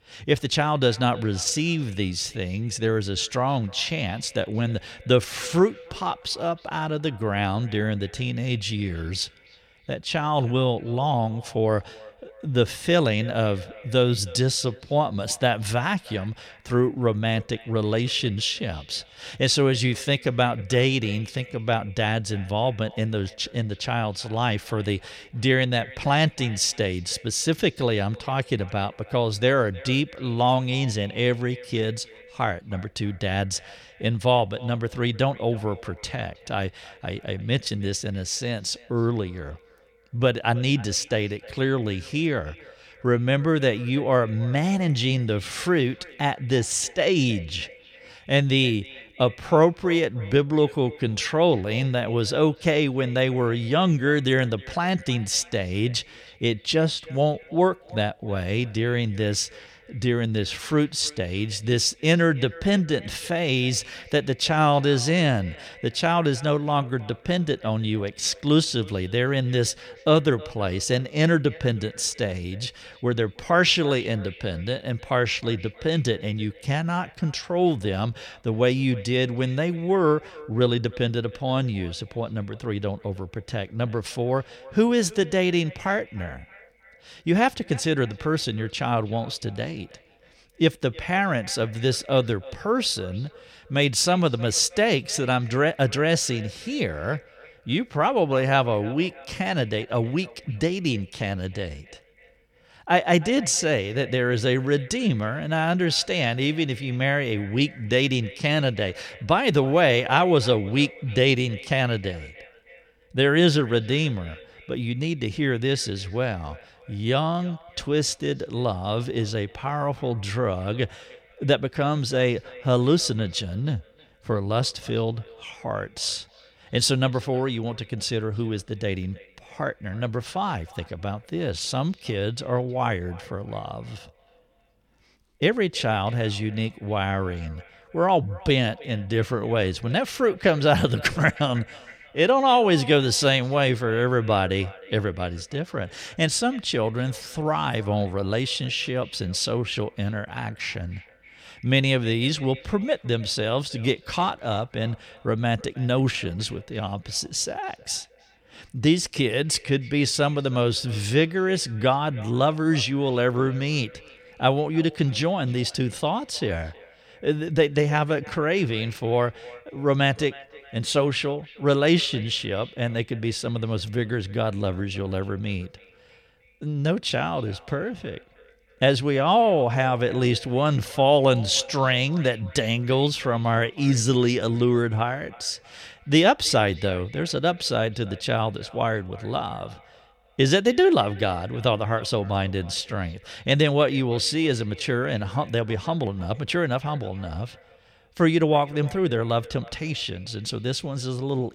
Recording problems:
echo of what is said; faint; throughout; 310 ms later, 20 dB below the speech

